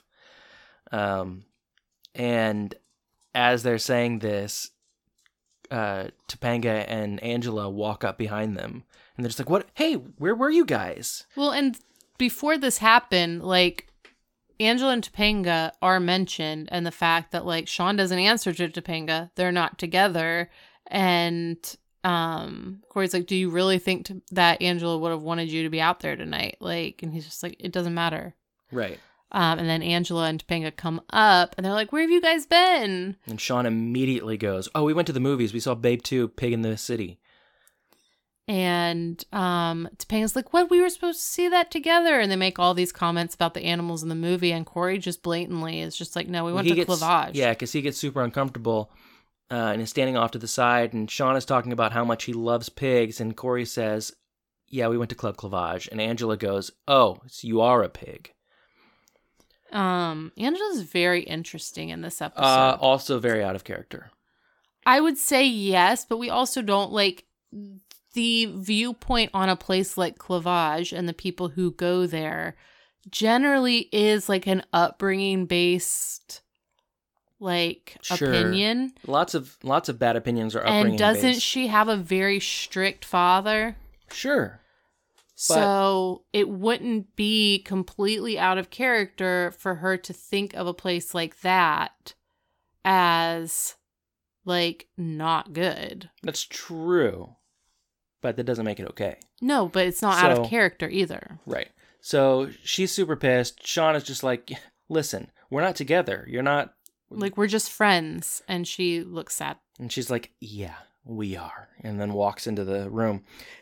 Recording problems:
none

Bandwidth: 17.5 kHz